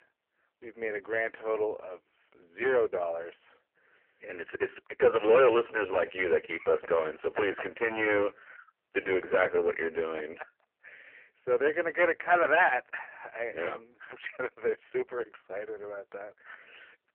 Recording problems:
phone-call audio; poor line
distortion; slight; 3% of the sound clipped

